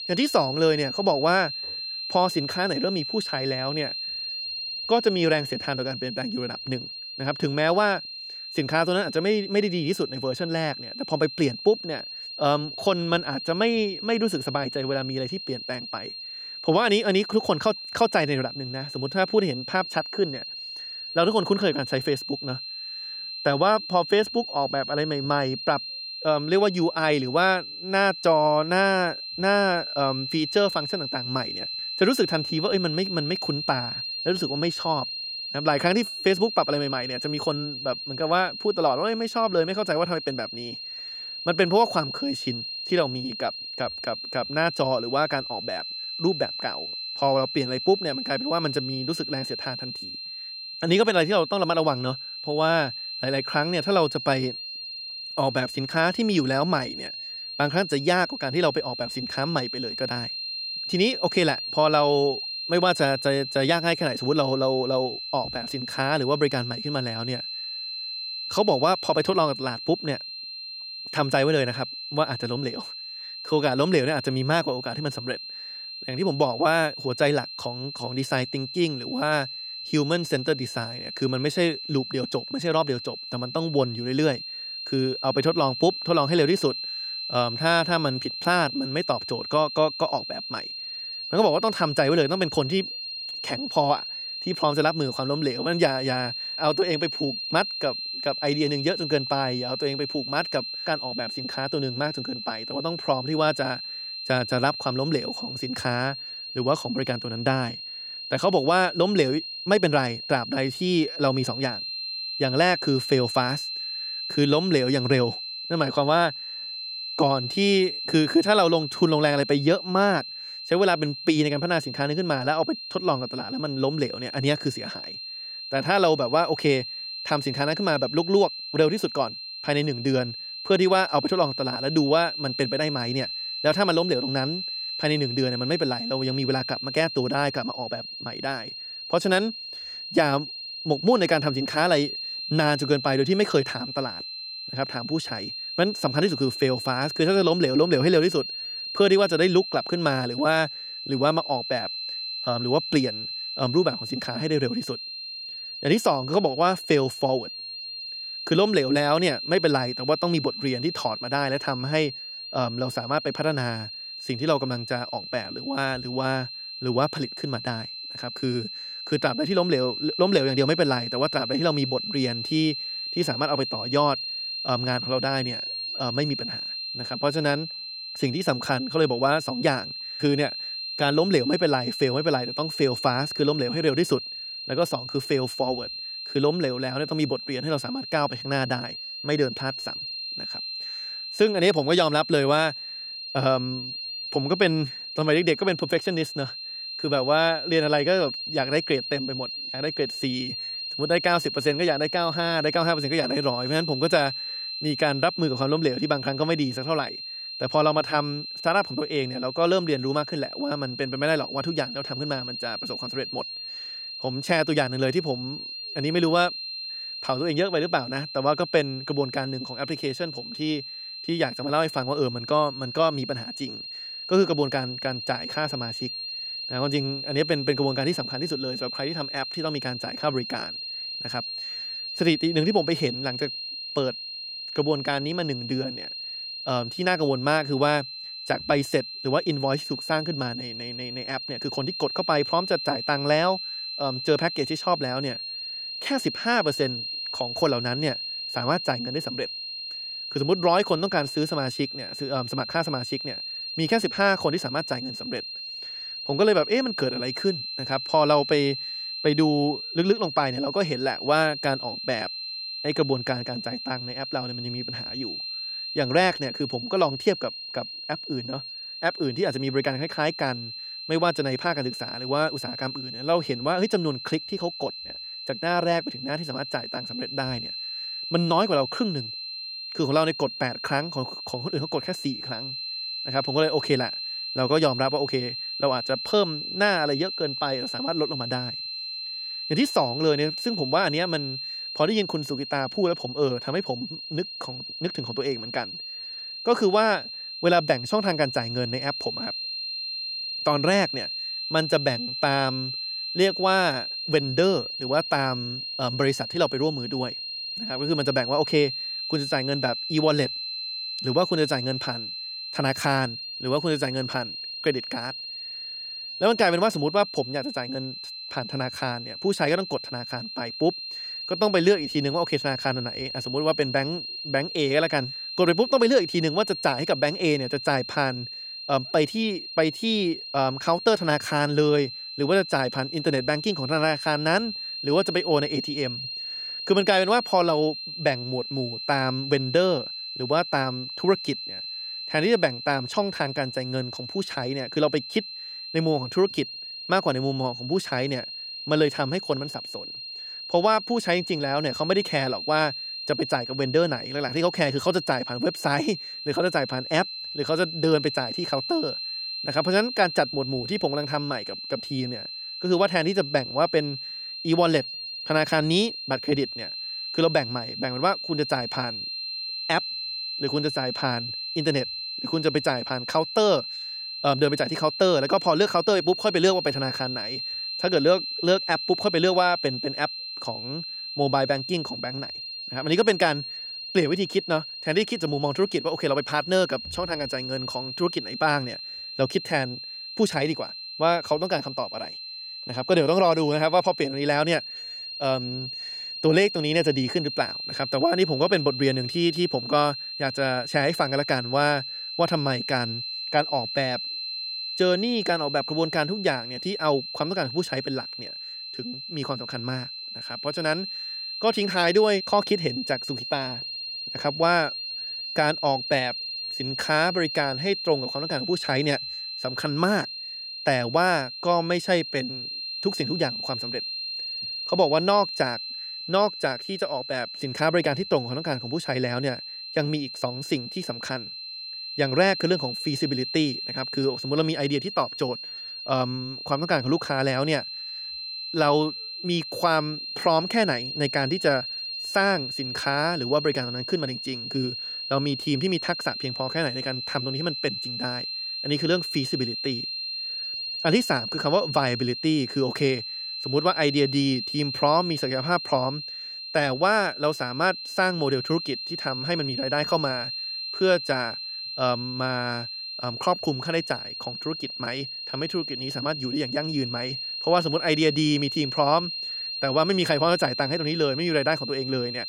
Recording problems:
high-pitched whine; loud; throughout; 4 kHz, 6 dB below the speech

